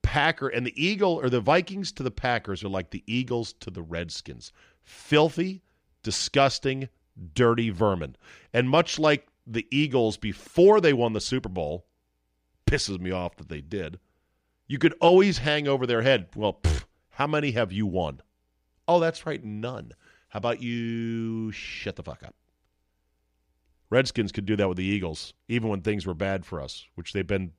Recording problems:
none

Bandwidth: 15 kHz